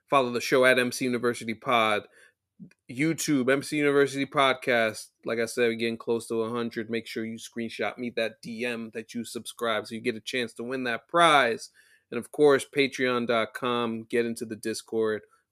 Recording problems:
none

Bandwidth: 14.5 kHz